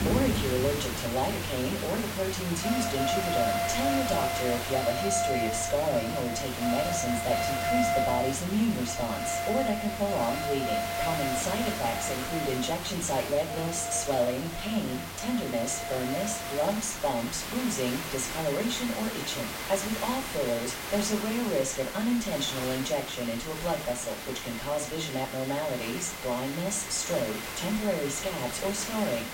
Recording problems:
off-mic speech; far
room echo; slight; dies away in 0.3 s
alarms or sirens; loud; throughout; 3 dB below the speech
hiss; loud; throughout; 5 dB below the speech

